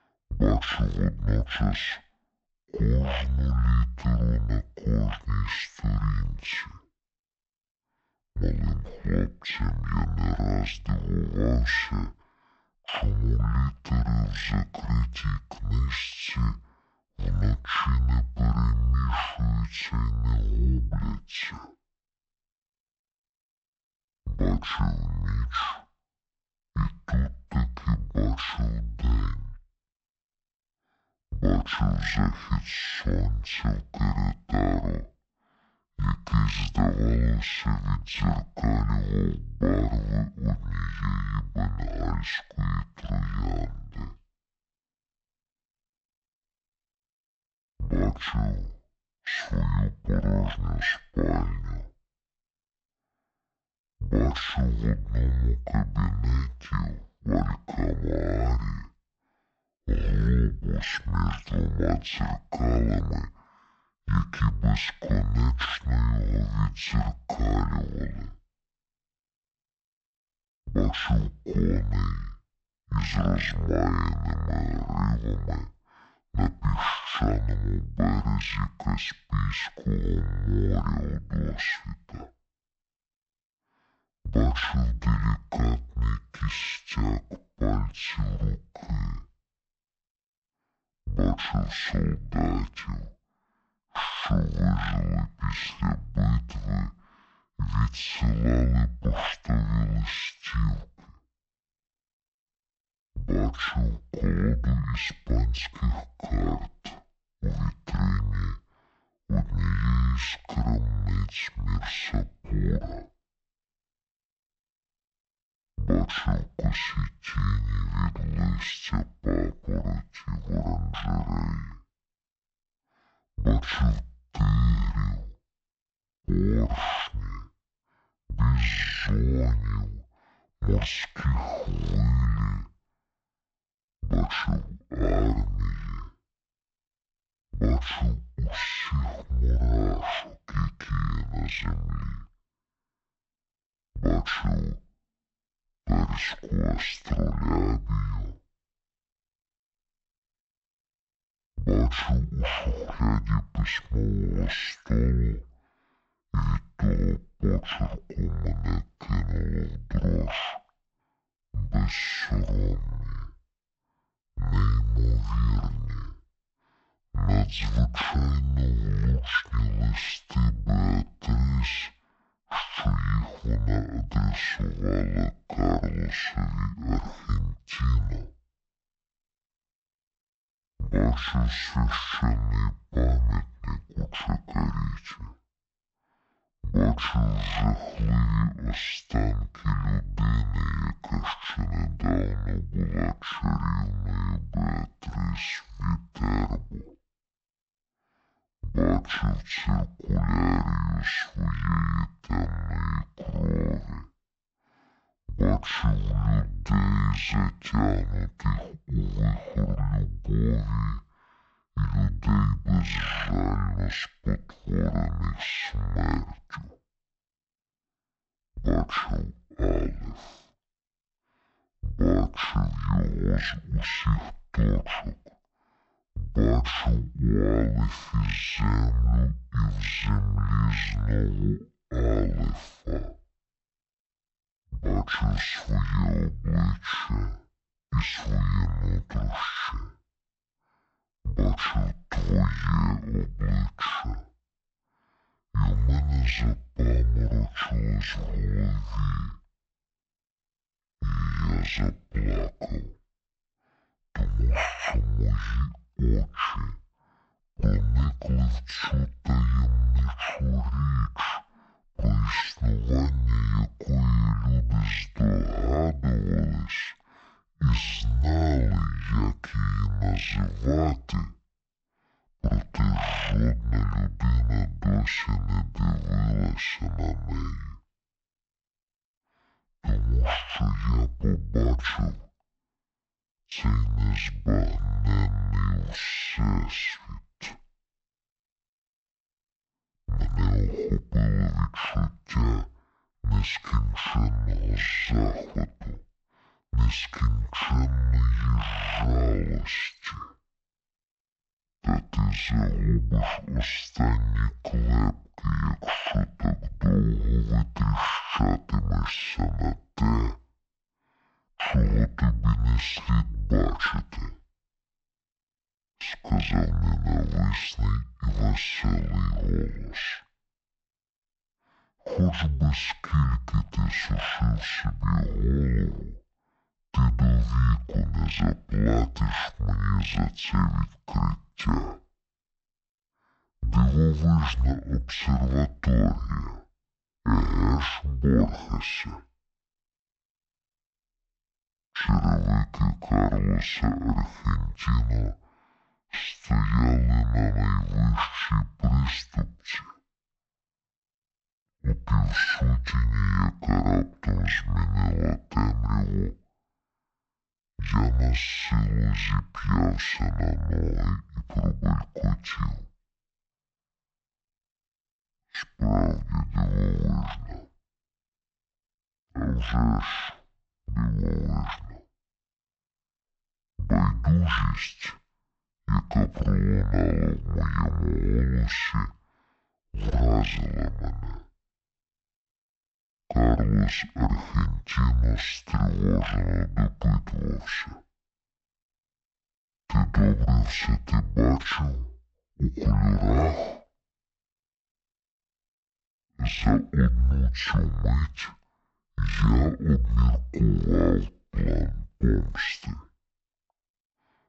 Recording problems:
wrong speed and pitch; too slow and too low; 0.5 times normal speed

